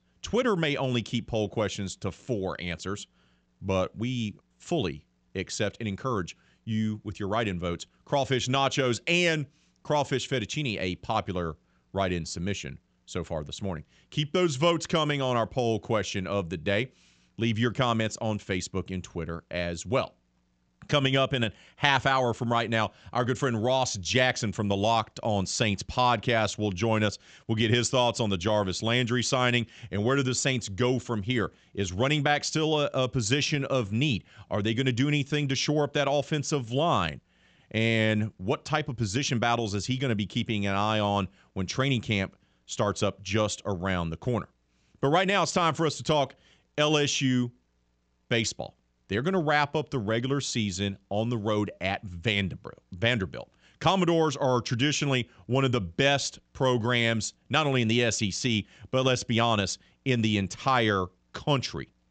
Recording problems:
high frequencies cut off; noticeable; nothing above 8 kHz

